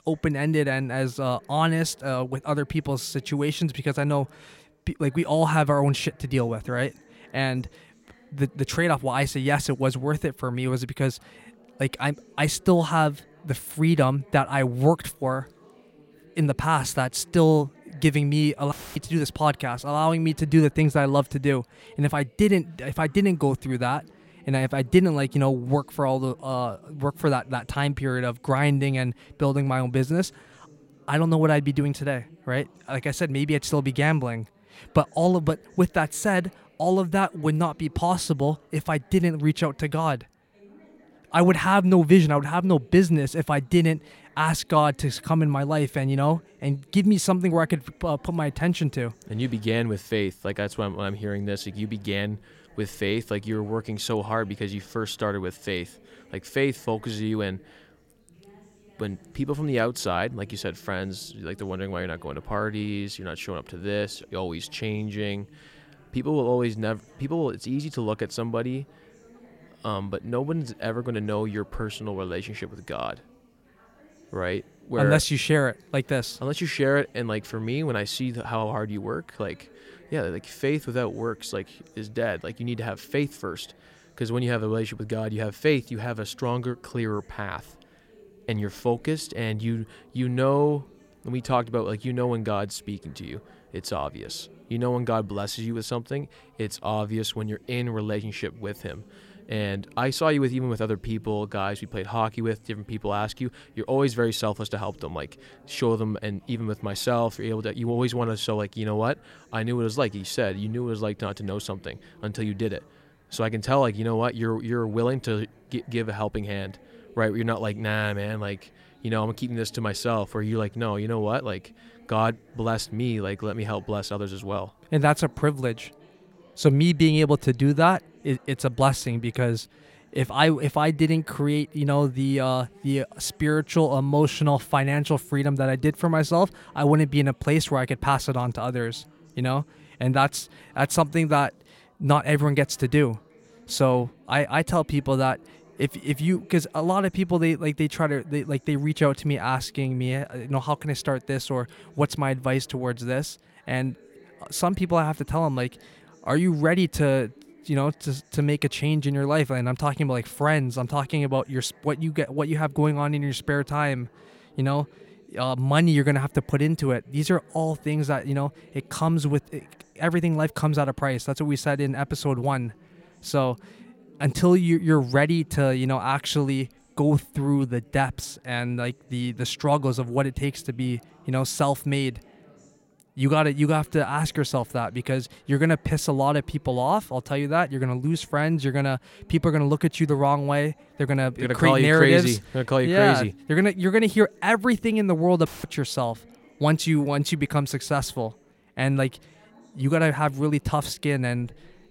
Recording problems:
background chatter; faint; throughout; 4 voices, 30 dB below the speech
audio cutting out; filled with static; at 19 s and at 3:15

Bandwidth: 16.5 kHz